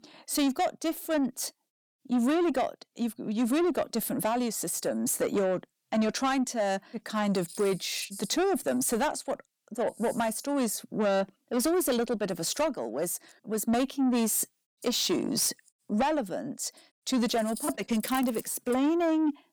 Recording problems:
distortion; slight; 10 dB below the speech

